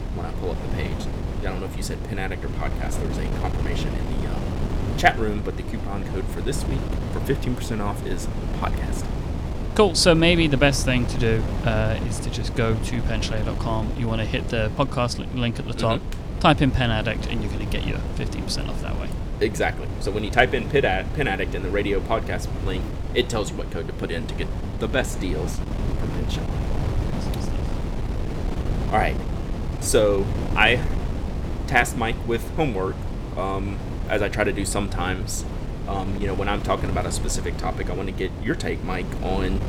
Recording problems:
wind noise on the microphone; occasional gusts; 10 dB below the speech

